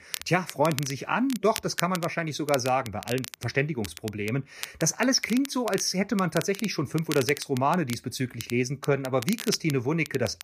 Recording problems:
crackle, like an old record; noticeable; 10 dB below the speech

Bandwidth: 14.5 kHz